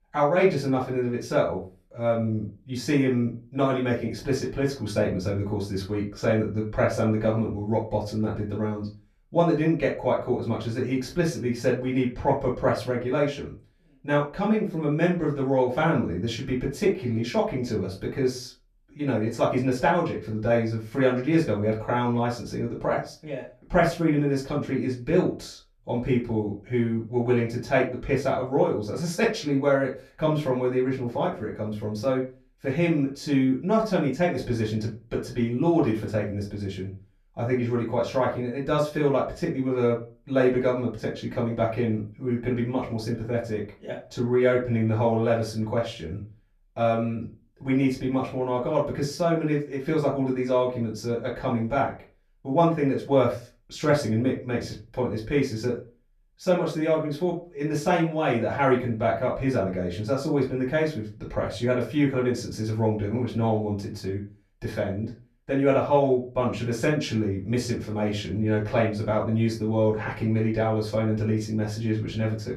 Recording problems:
off-mic speech; far
room echo; slight; dies away in 0.3 s

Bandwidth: 14.5 kHz